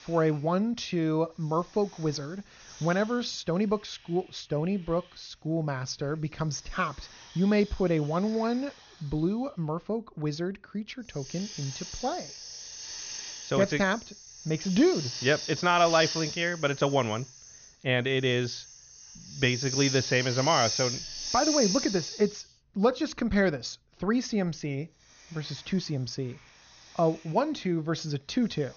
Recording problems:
high frequencies cut off; noticeable; nothing above 6.5 kHz
hiss; loud; throughout; 6 dB below the speech

